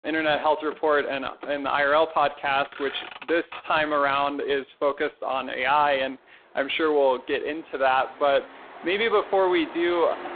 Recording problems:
phone-call audio; poor line
traffic noise; noticeable; throughout; 15 dB below the speech

